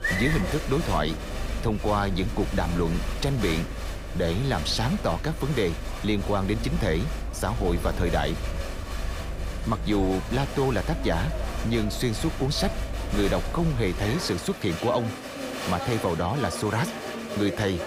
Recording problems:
crowd noise; loud; throughout; 6 dB below the speech

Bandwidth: 15.5 kHz